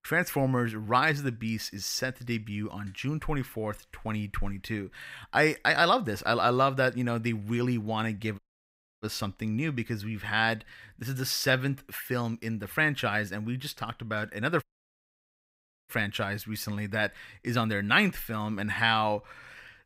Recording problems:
audio cutting out; at 8.5 s for 0.5 s and at 15 s for 1.5 s

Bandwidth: 15.5 kHz